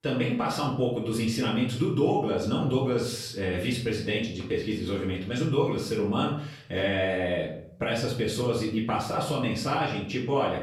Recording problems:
off-mic speech; far
room echo; noticeable; dies away in 0.6 s

